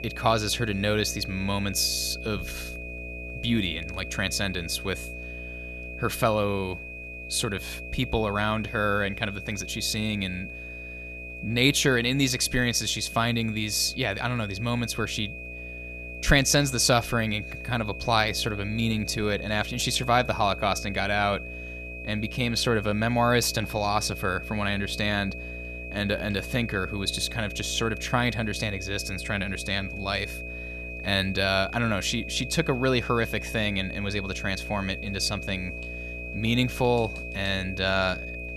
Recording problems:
high-pitched whine; noticeable; throughout; 2.5 kHz, 10 dB below the speech
electrical hum; faint; throughout; 60 Hz, 20 dB below the speech

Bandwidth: 13.5 kHz